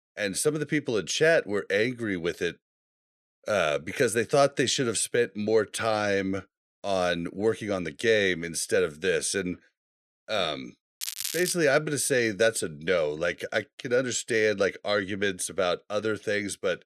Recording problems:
crackling; loud; at 11 s; 6 dB below the speech

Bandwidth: 13.5 kHz